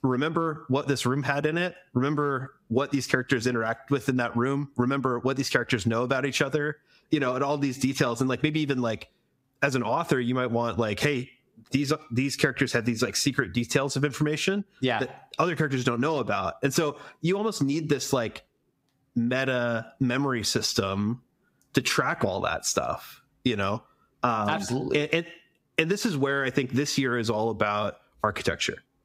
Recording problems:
squashed, flat; somewhat

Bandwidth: 15.5 kHz